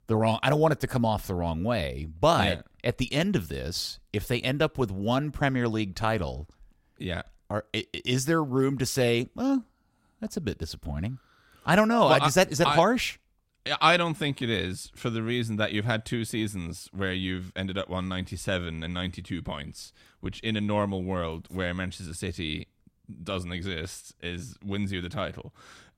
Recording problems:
none

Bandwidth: 16 kHz